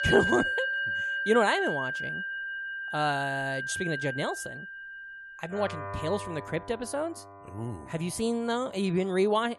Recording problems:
background music; loud; throughout; 2 dB below the speech

